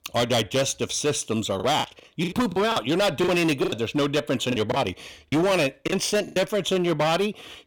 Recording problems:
distortion; heavy; 16% of the sound clipped
choppy; very; from 1.5 to 3.5 s and from 4.5 to 6.5 s; 18% of the speech affected

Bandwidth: 18 kHz